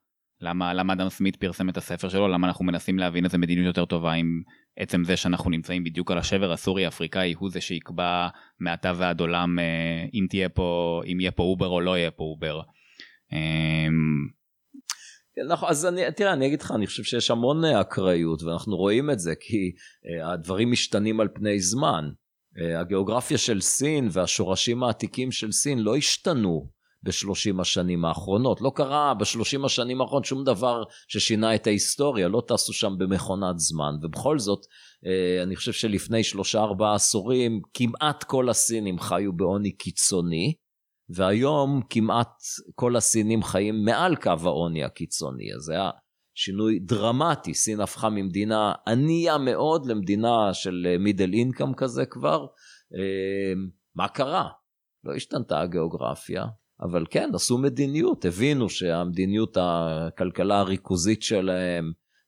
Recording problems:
none

